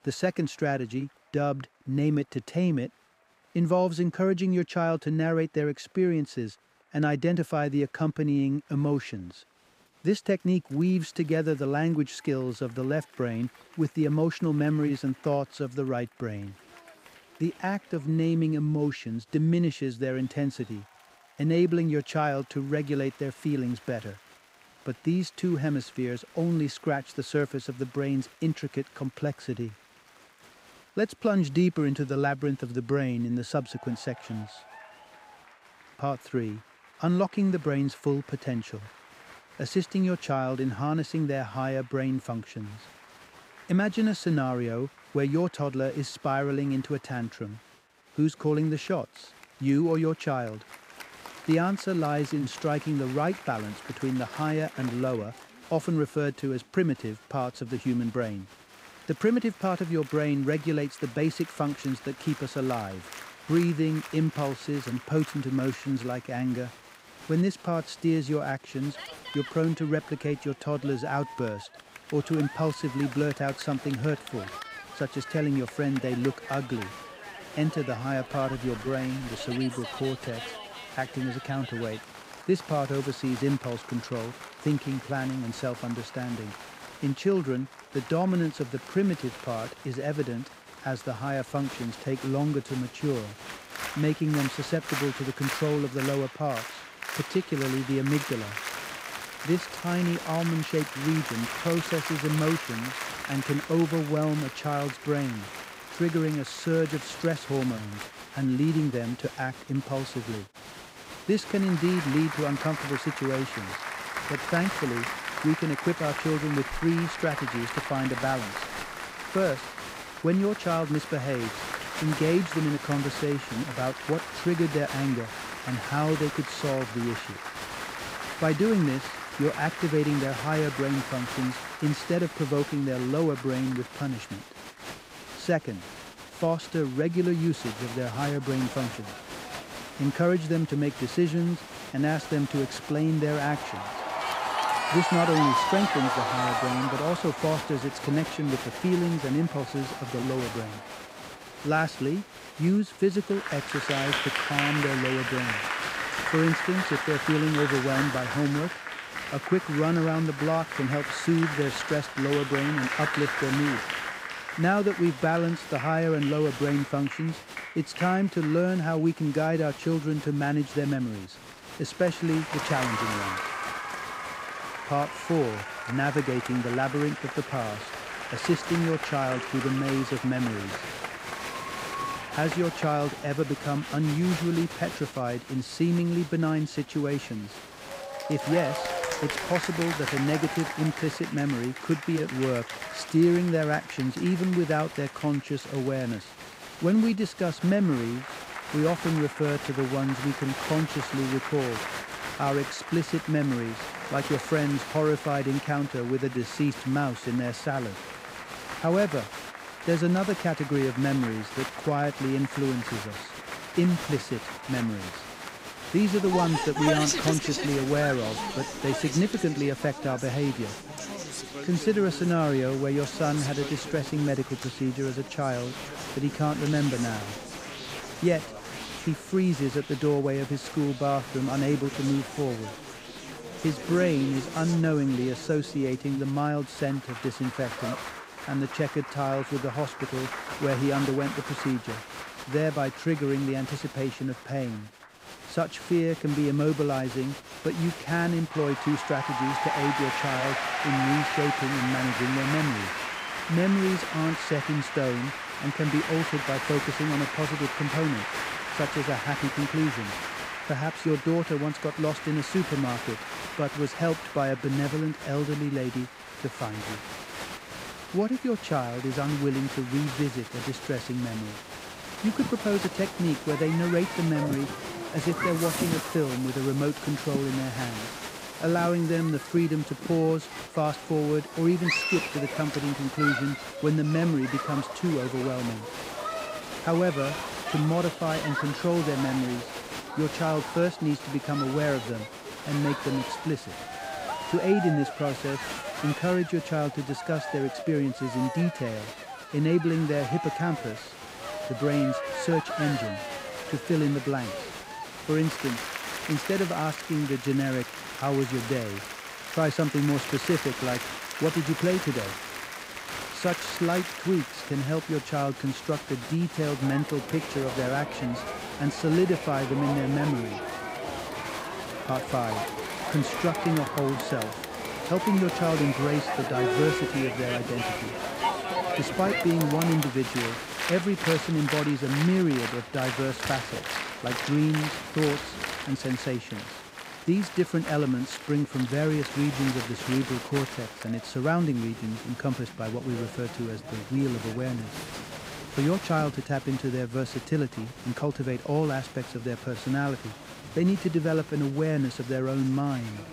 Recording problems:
crowd noise; loud; throughout; 6 dB below the speech

